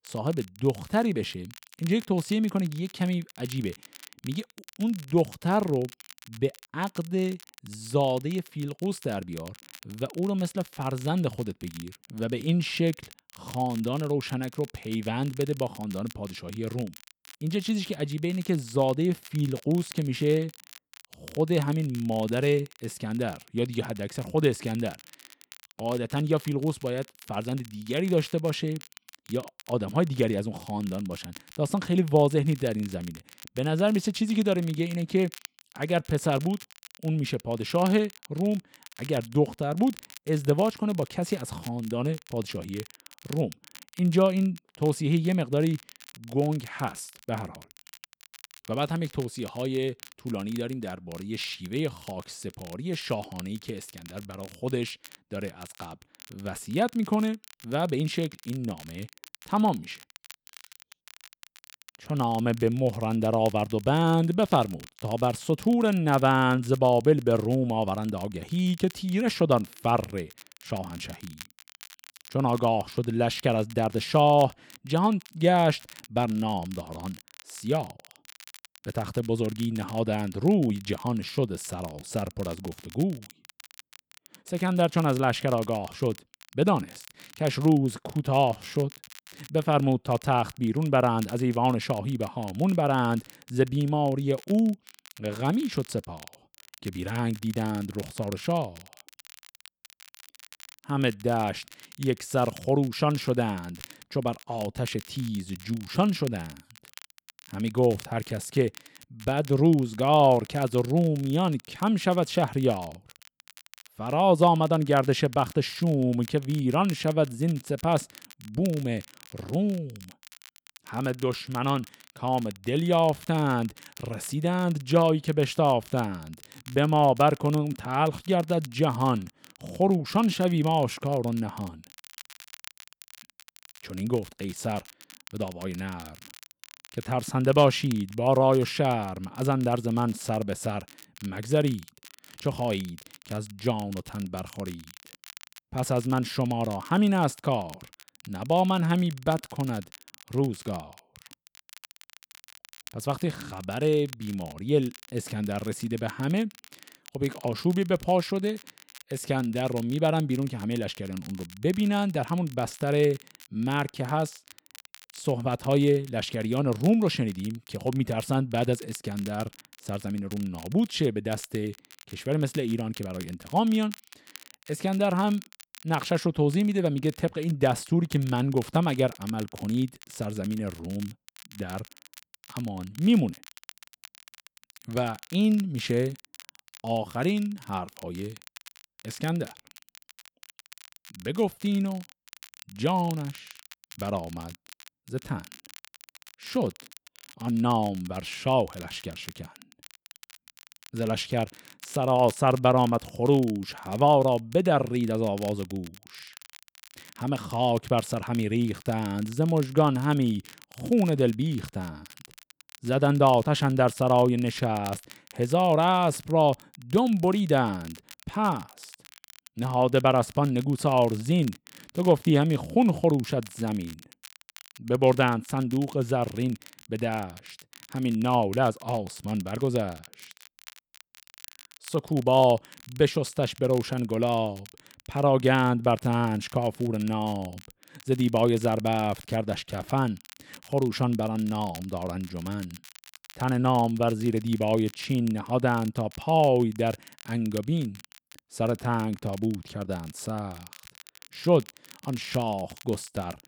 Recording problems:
crackle, like an old record; faint; 20 dB below the speech

